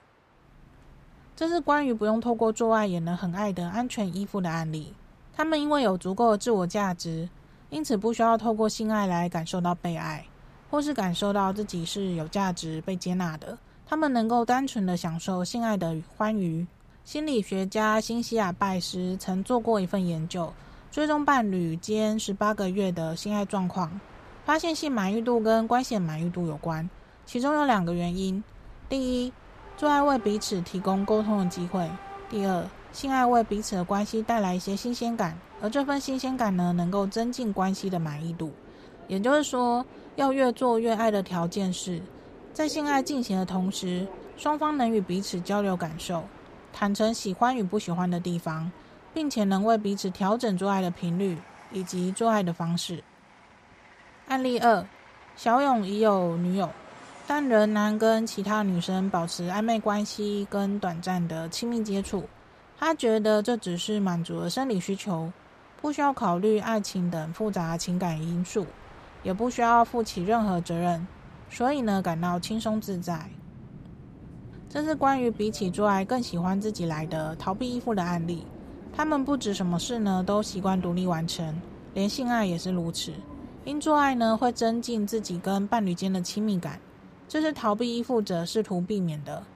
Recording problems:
train or aircraft noise; faint; throughout; 20 dB below the speech

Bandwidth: 14.5 kHz